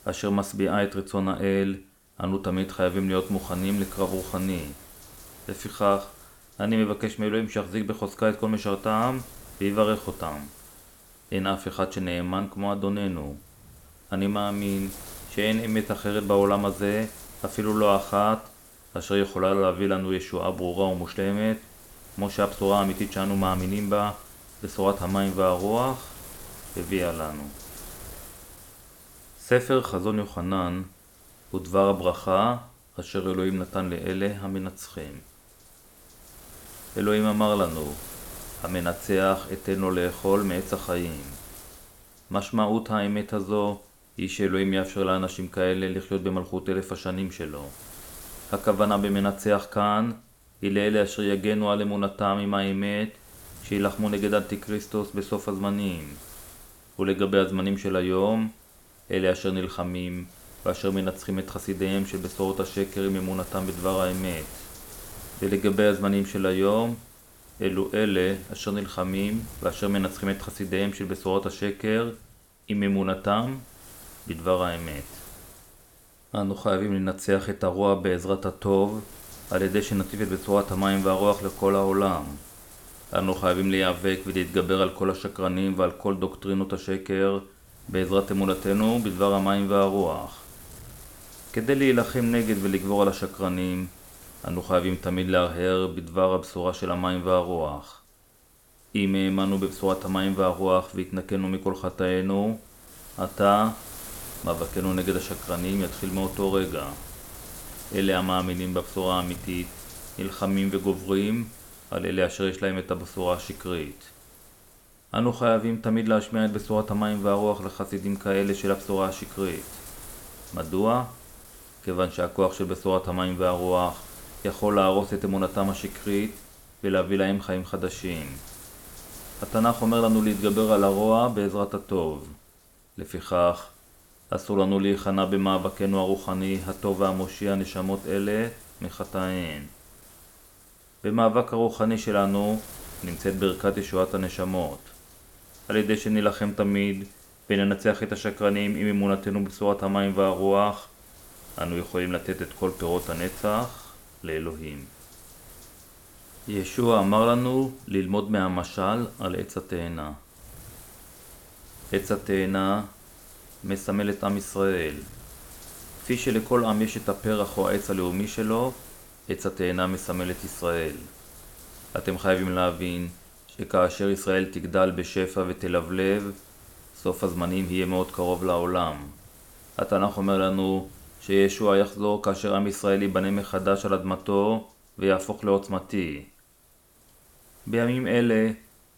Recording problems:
wind noise on the microphone; occasional gusts; 20 dB below the speech

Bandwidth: 17 kHz